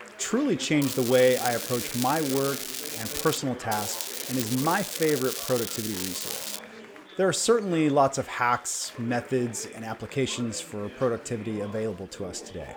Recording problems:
crackling; loud; from 1 to 3.5 s and from 3.5 to 6.5 s; 5 dB below the speech
chatter from many people; noticeable; throughout; 15 dB below the speech

